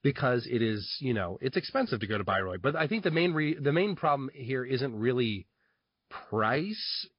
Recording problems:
high frequencies cut off; noticeable; nothing above 5 kHz
garbled, watery; slightly

